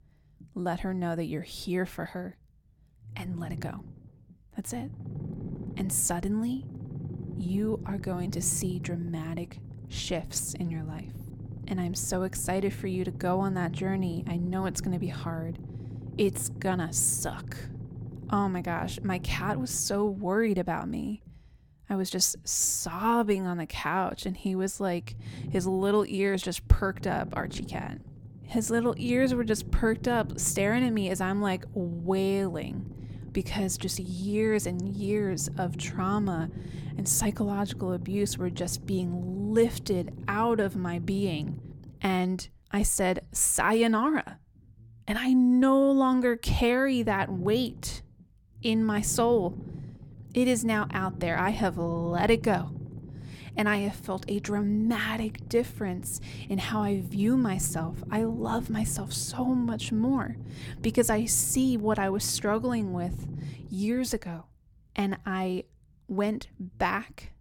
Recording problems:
low rumble; noticeable; throughout; 20 dB below the speech

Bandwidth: 17.5 kHz